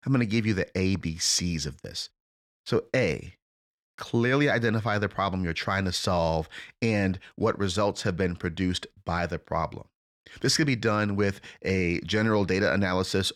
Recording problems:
none

